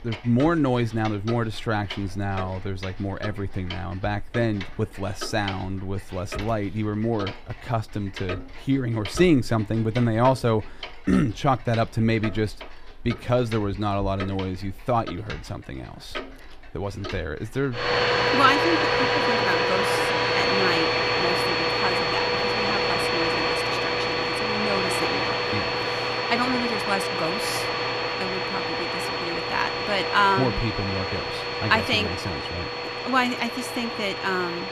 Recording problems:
household noises; very loud; throughout; 2 dB above the speech

